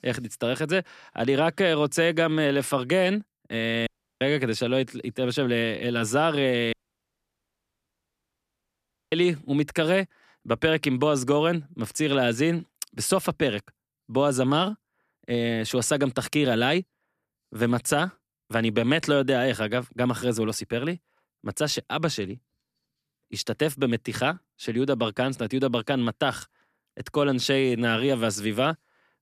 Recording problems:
audio cutting out; at 4 s and at 6.5 s for 2.5 s

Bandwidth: 14.5 kHz